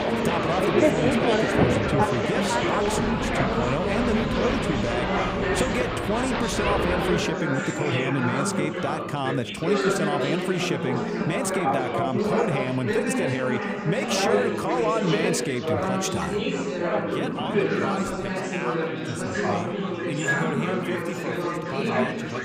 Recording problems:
chatter from many people; very loud; throughout; 4 dB above the speech

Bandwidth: 15.5 kHz